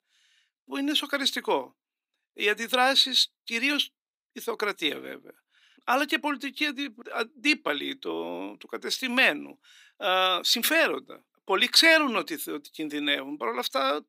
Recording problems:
thin; somewhat; fading below 350 Hz

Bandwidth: 15.5 kHz